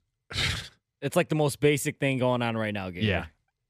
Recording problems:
none

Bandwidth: 14.5 kHz